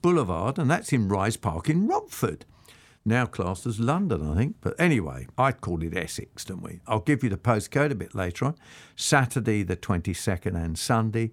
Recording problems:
none

